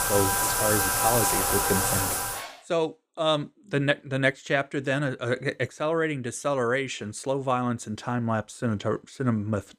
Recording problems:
household noises; very loud; until 2.5 s; 4 dB above the speech

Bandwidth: 15.5 kHz